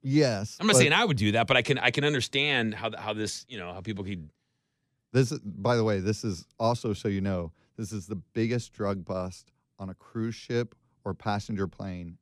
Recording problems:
none

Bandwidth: 14.5 kHz